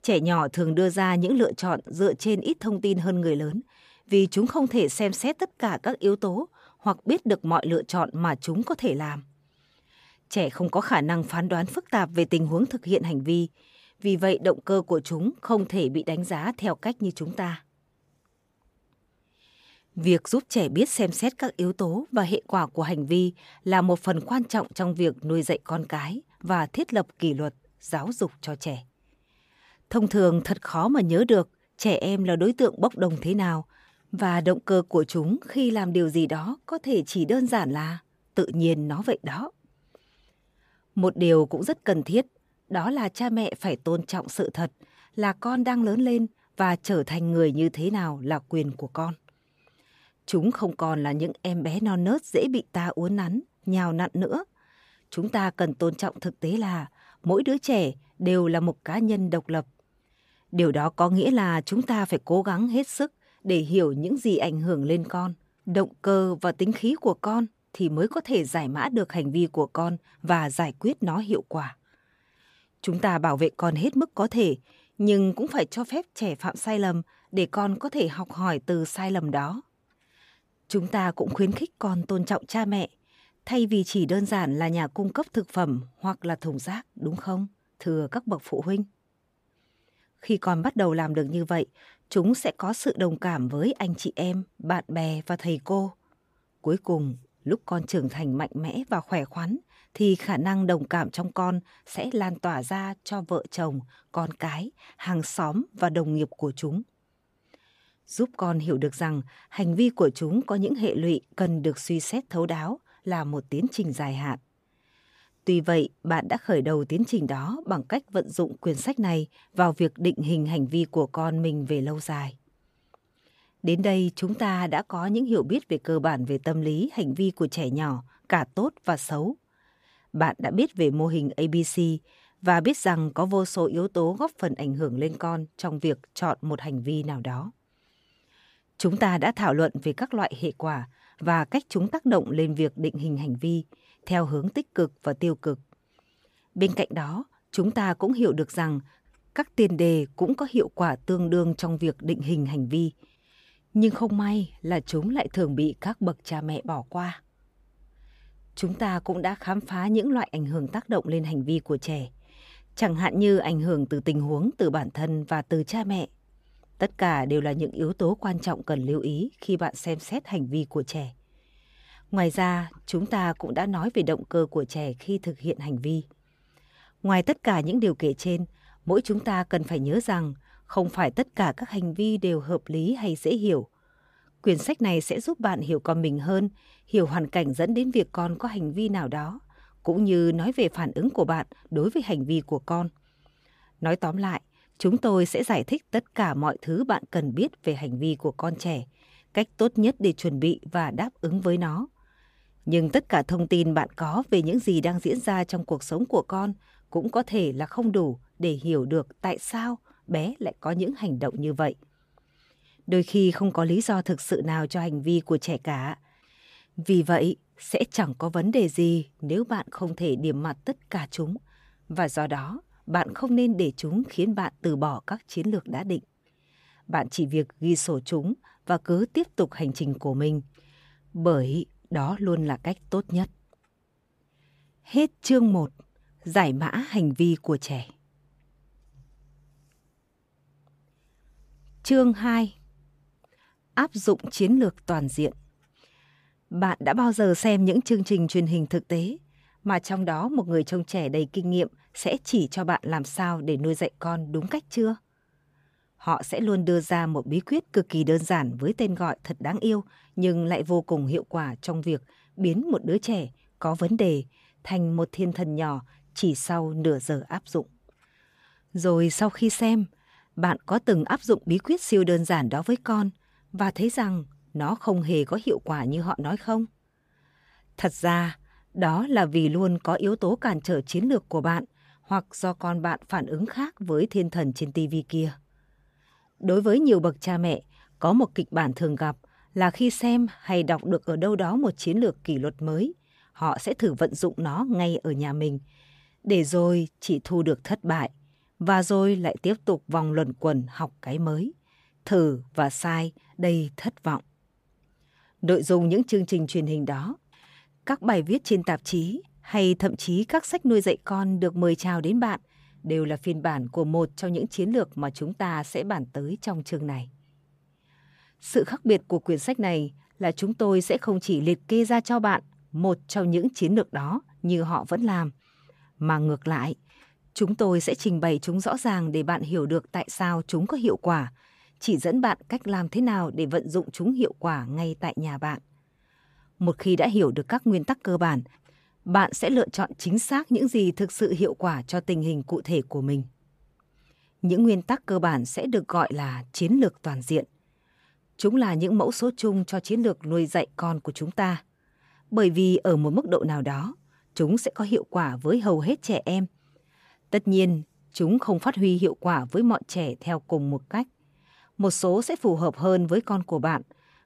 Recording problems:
none

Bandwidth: 15 kHz